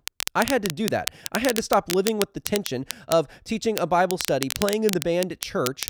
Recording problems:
crackle, like an old record; loud; 6 dB below the speech

